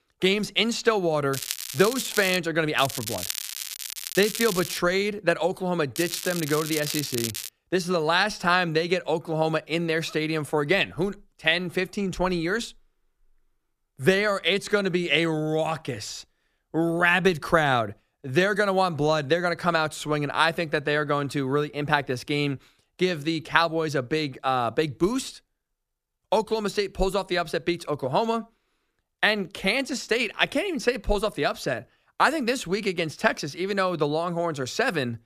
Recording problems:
crackling; loud; from 1.5 to 2.5 s, from 3 to 5 s and from 6 to 7.5 s; 7 dB below the speech

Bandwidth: 14.5 kHz